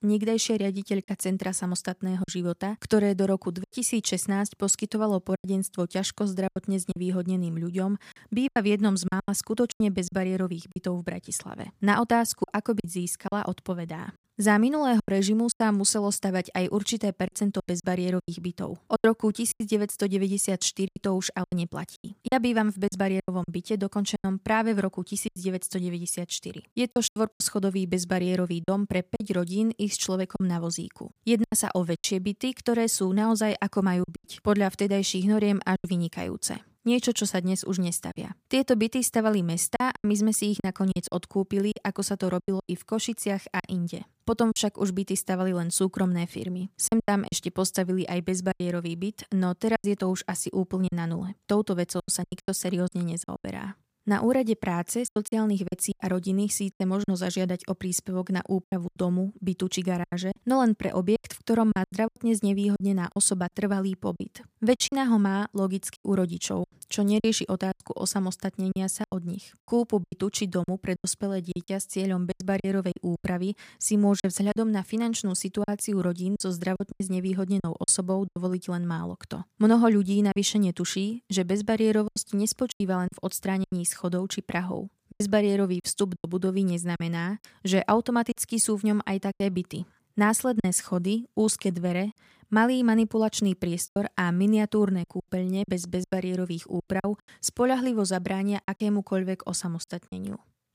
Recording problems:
choppy; very; 8% of the speech affected

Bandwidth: 15 kHz